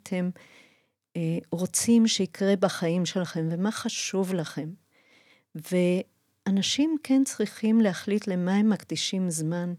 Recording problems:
none

